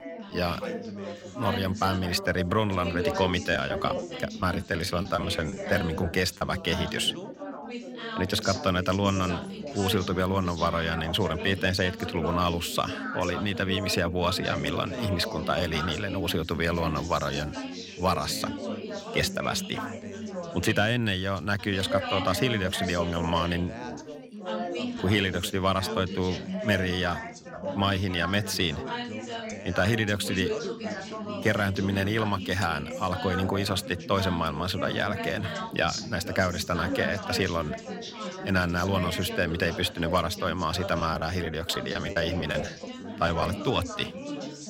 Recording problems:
background chatter; loud; throughout; 4 voices, 7 dB below the speech
choppy; very; from 3.5 to 6.5 s and from 41 to 44 s; 10% of the speech affected

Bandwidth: 16.5 kHz